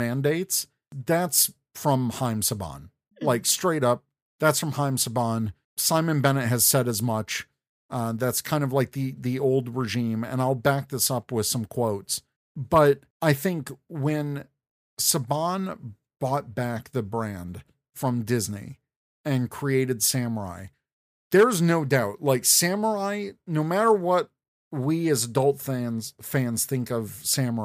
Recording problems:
abrupt cut into speech; at the start and the end

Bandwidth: 15 kHz